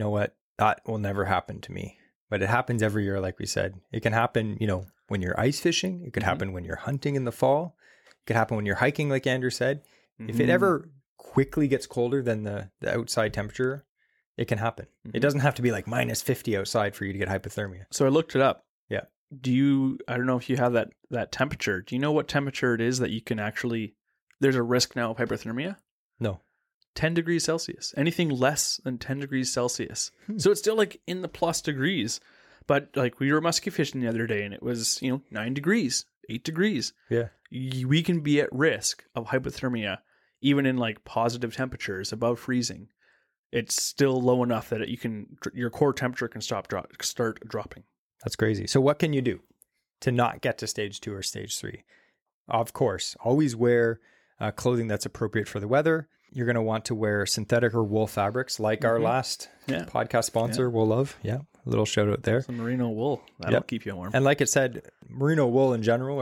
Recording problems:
abrupt cut into speech; at the start and the end

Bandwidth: 17.5 kHz